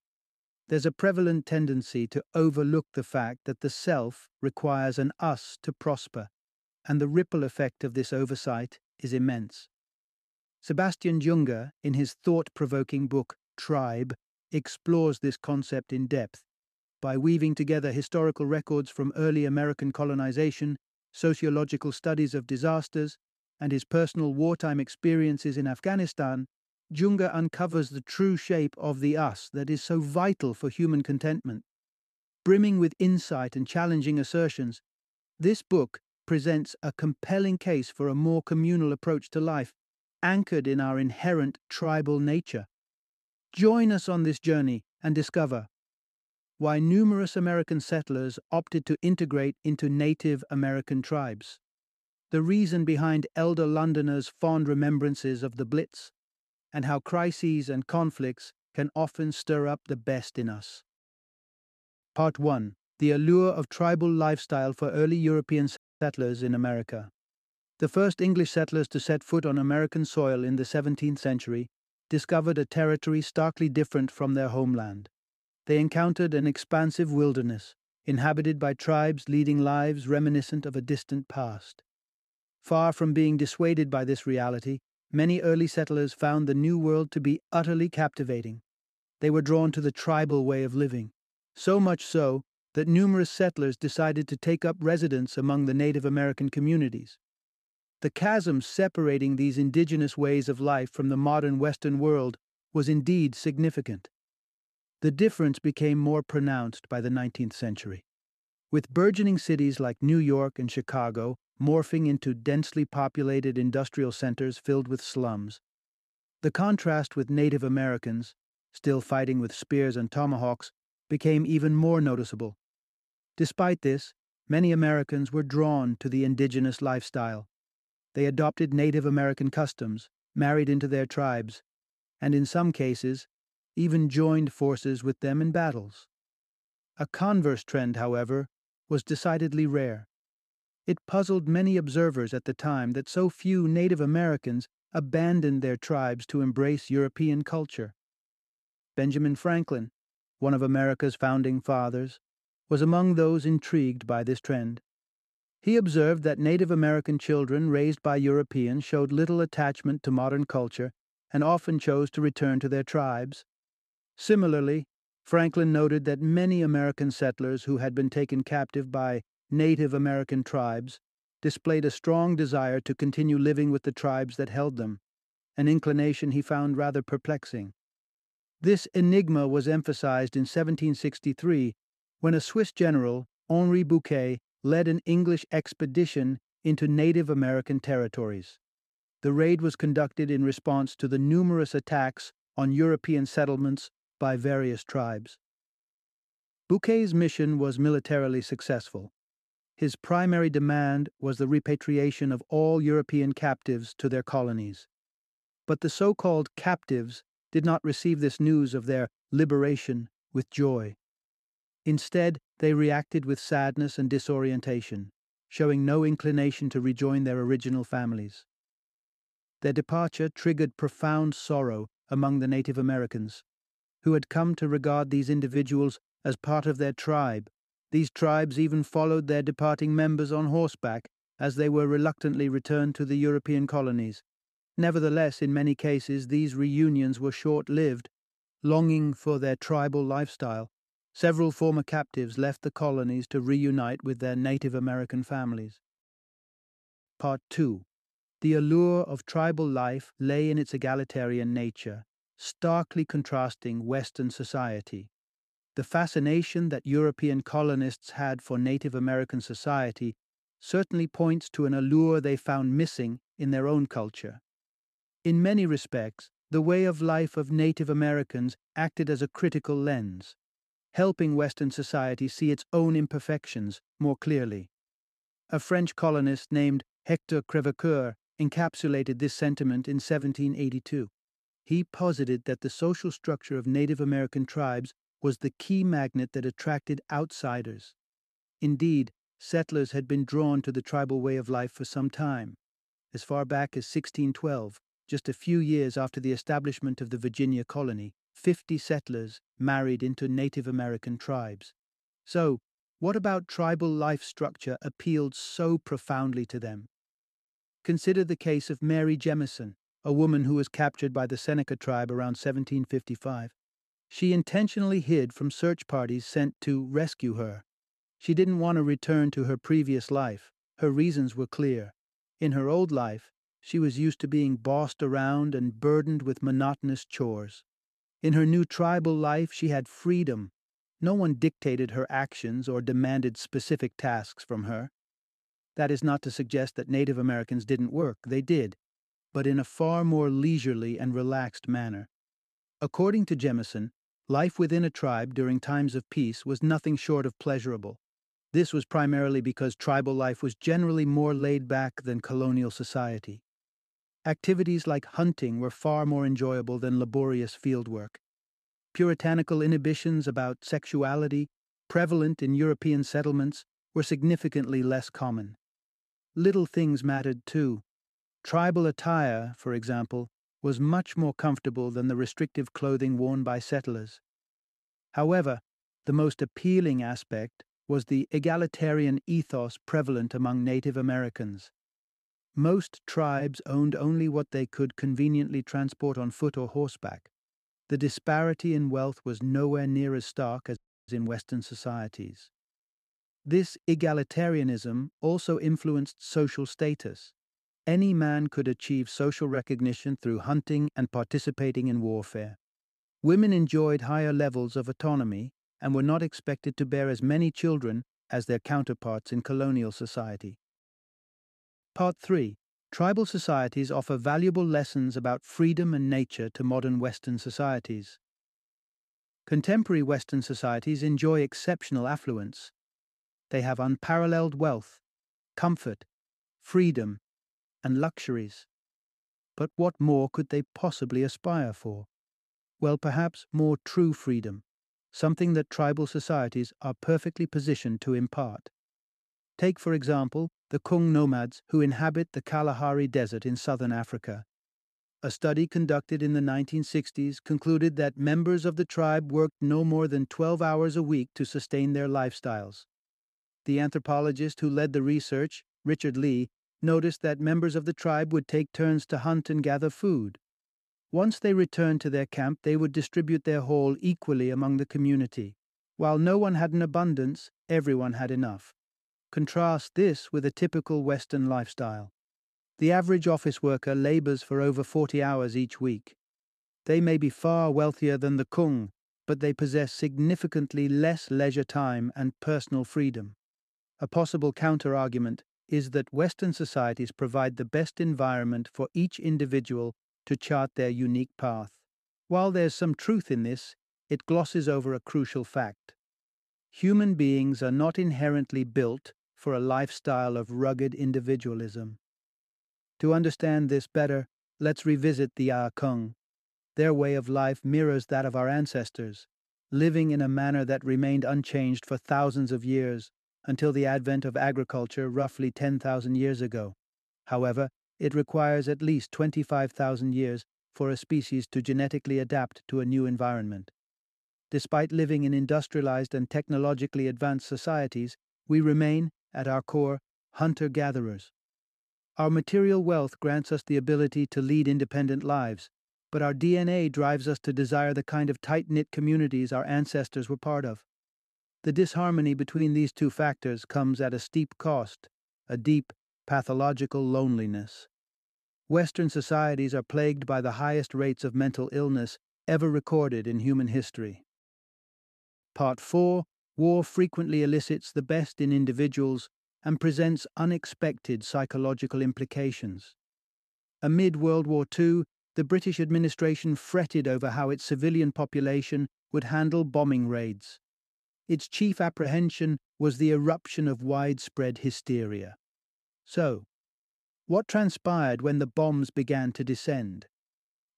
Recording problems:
audio cutting out; at 1:06 and at 6:31

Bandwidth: 13.5 kHz